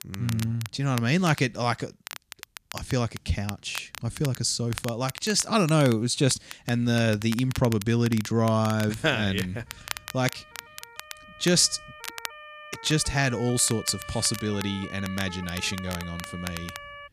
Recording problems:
crackle, like an old record; noticeable; 15 dB below the speech
siren; faint; from 9.5 s on; peak 15 dB below the speech

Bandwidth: 14.5 kHz